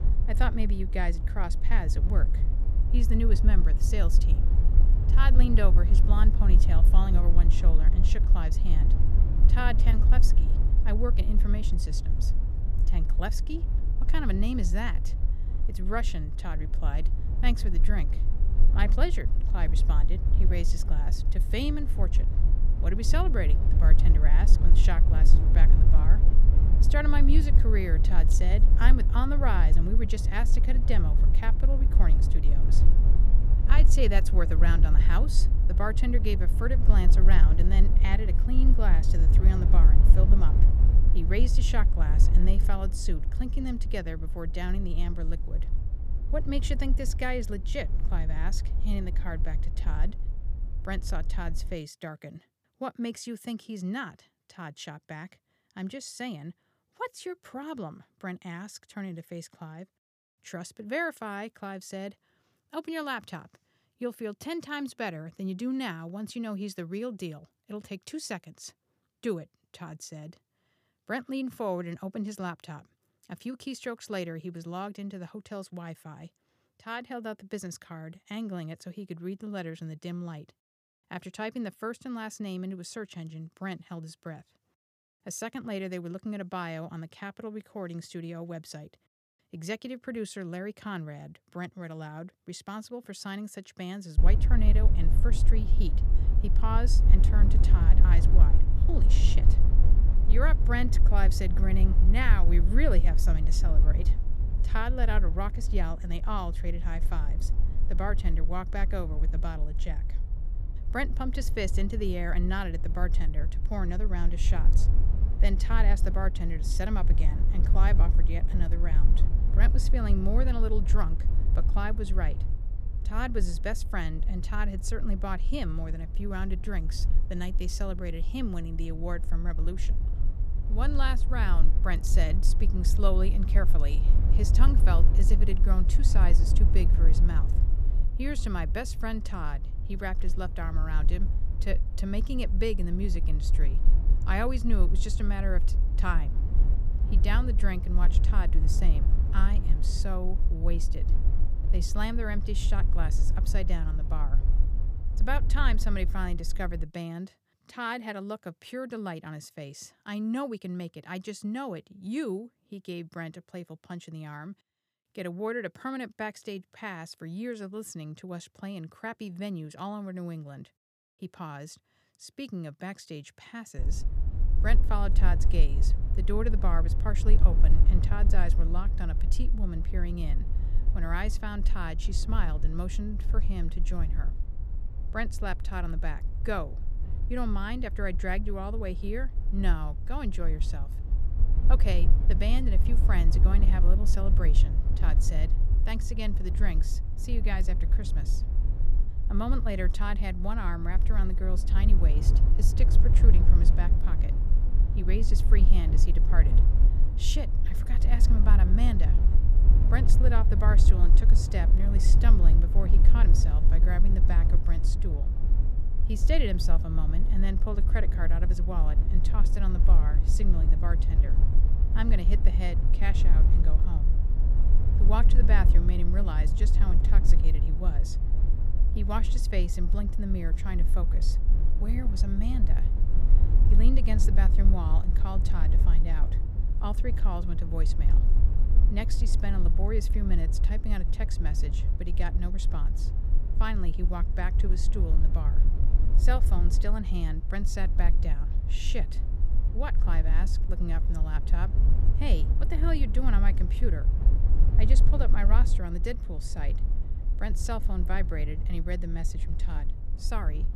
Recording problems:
low rumble; loud; until 52 s, from 1:34 to 2:37 and from 2:54 on; 9 dB below the speech

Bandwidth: 15 kHz